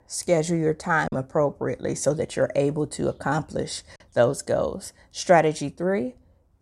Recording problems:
choppy; occasionally; 1% of the speech affected

